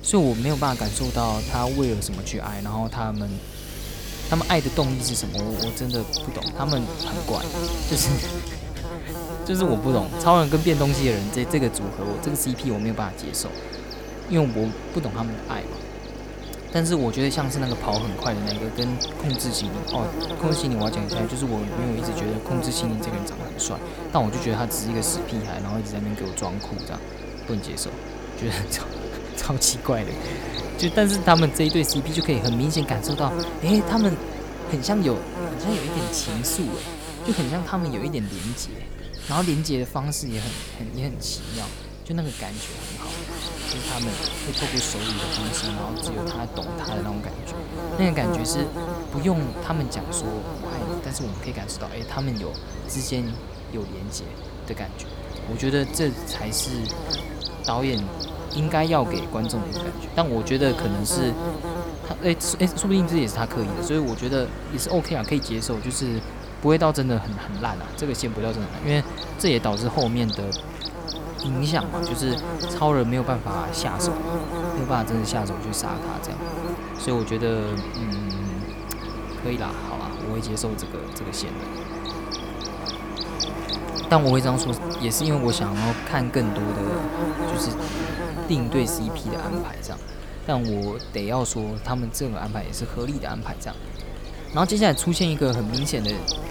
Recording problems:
electrical hum; loud; throughout; 50 Hz, 6 dB below the speech
machinery noise; noticeable; throughout; 10 dB below the speech

